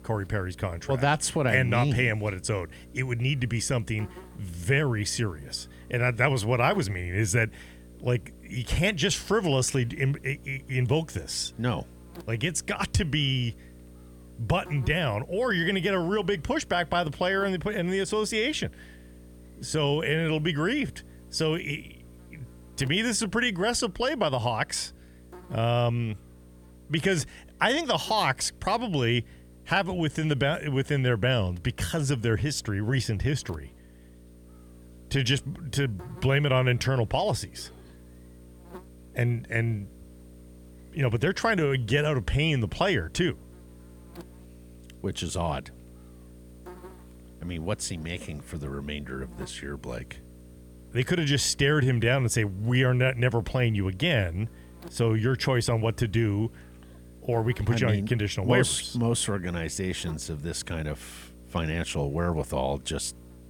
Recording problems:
electrical hum; faint; throughout; 60 Hz, 25 dB below the speech

